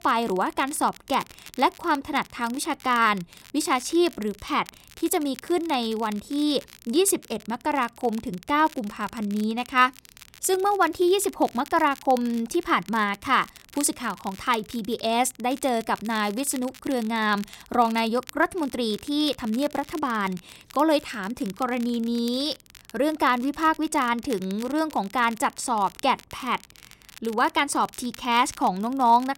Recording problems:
crackle, like an old record; faint; 20 dB below the speech

